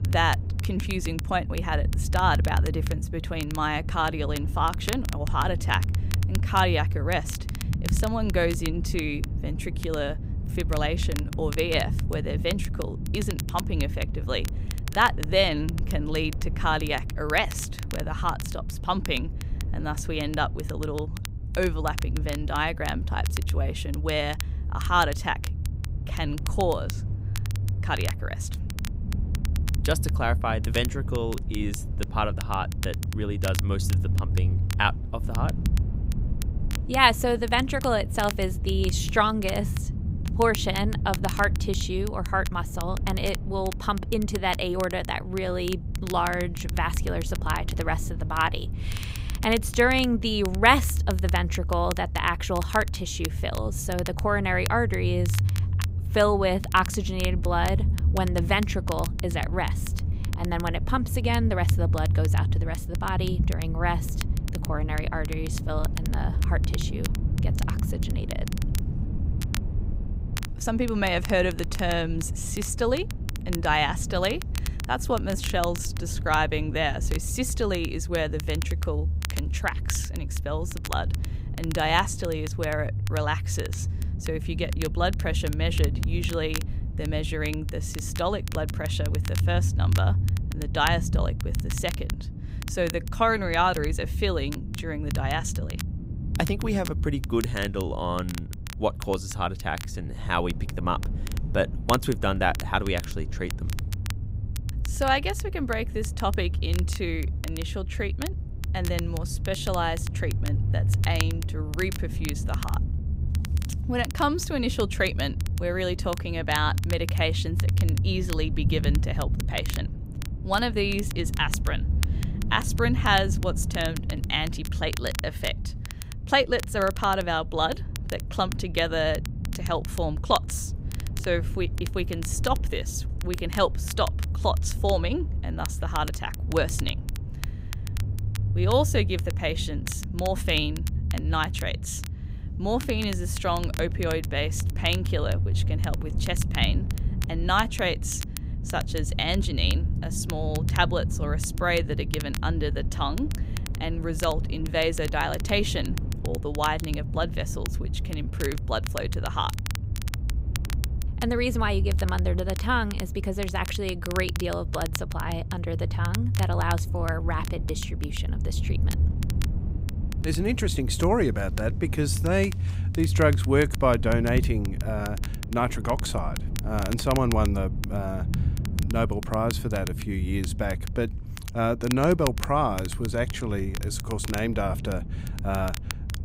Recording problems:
low rumble; noticeable; throughout; 15 dB below the speech
crackle, like an old record; noticeable; 15 dB below the speech

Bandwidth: 15.5 kHz